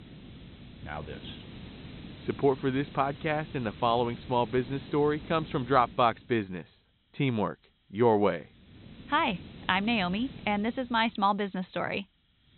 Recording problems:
high frequencies cut off; severe; nothing above 4 kHz
hiss; noticeable; throughout; 15 dB below the speech

